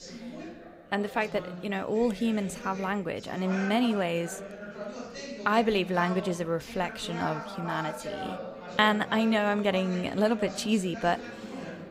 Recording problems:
chatter from many people; noticeable; throughout; 10 dB below the speech

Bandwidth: 15.5 kHz